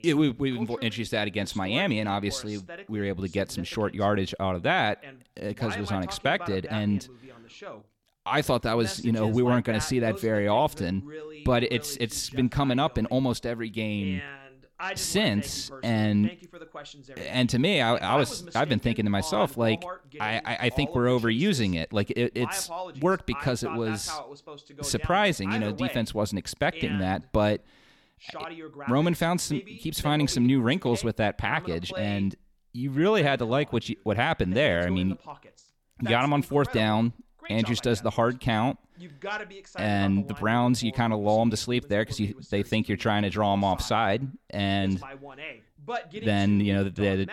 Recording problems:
voice in the background; noticeable; throughout; 15 dB below the speech

